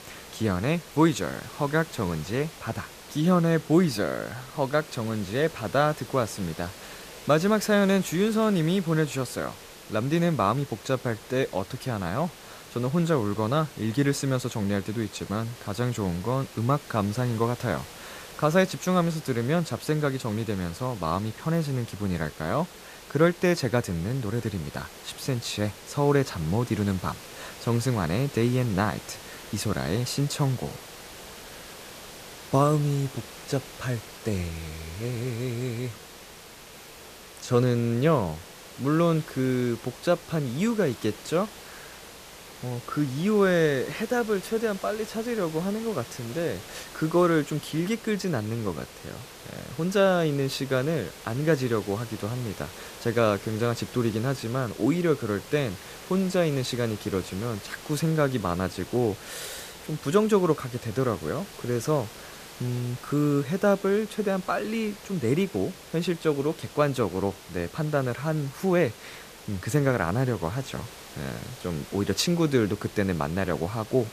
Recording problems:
hiss; noticeable; throughout; 15 dB below the speech

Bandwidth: 14.5 kHz